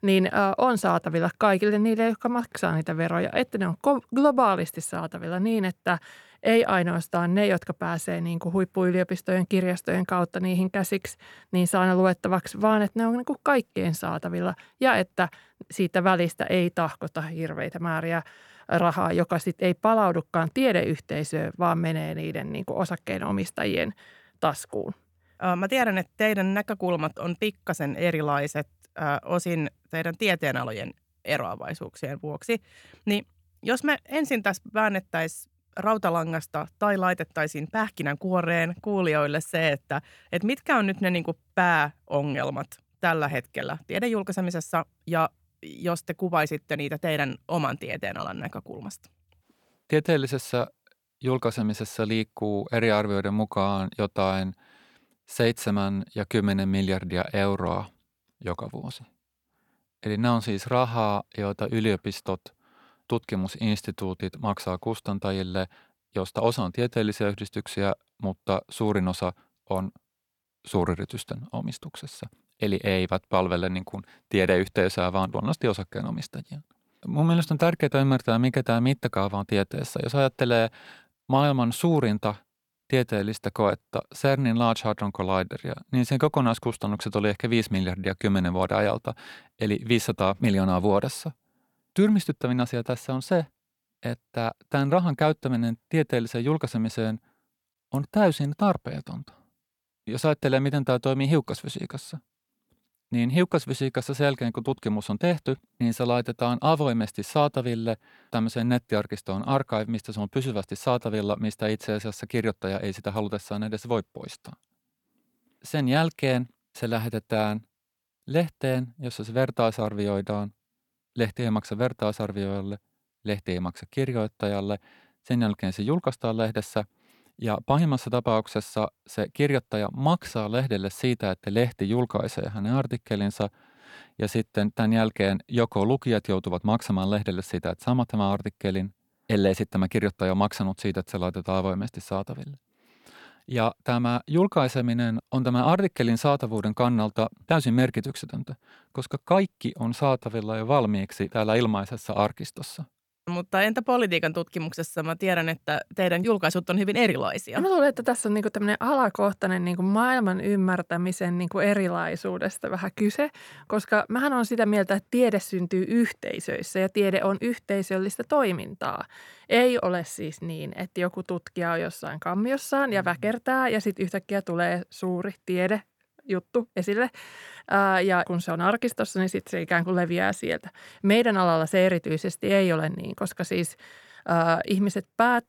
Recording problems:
none

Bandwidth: 18.5 kHz